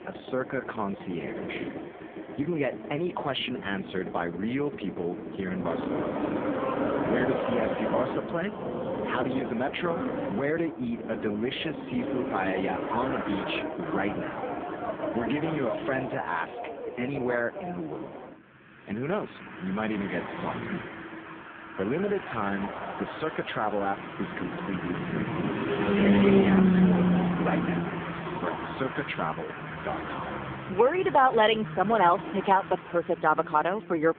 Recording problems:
phone-call audio; poor line
traffic noise; loud; throughout; 1 dB below the speech

